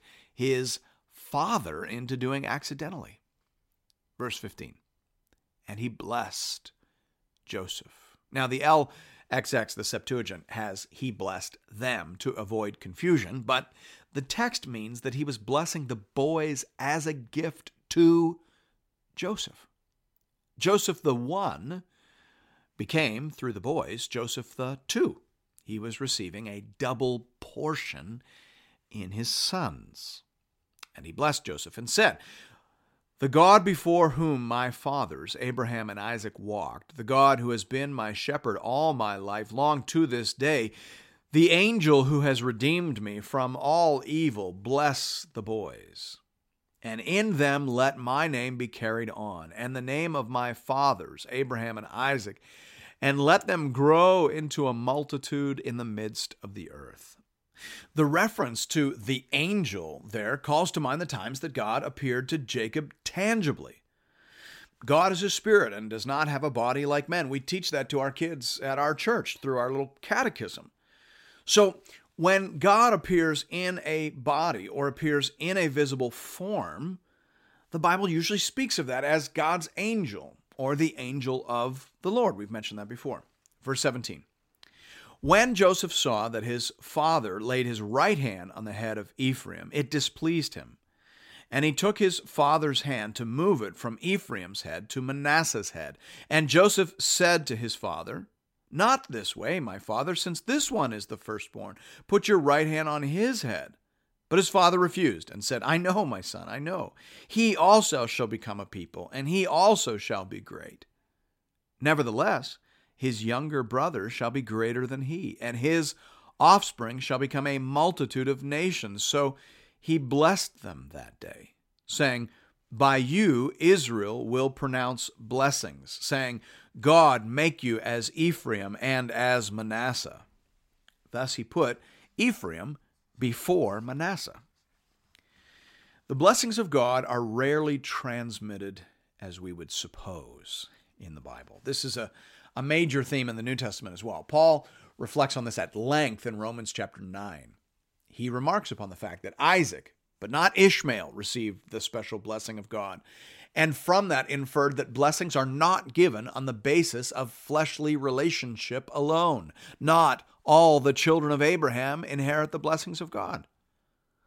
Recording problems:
none

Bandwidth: 16 kHz